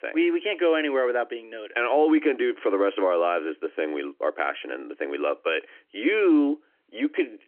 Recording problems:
phone-call audio; nothing above 3 kHz

